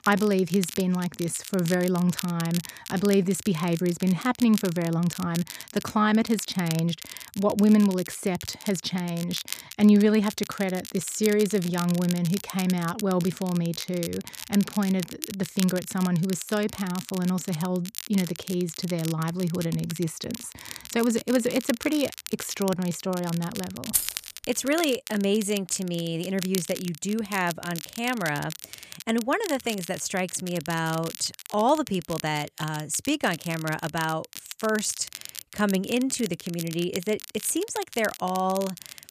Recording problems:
crackle, like an old record; noticeable; 10 dB below the speech
jangling keys; loud; at 24 s; peak 1 dB above the speech

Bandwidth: 14.5 kHz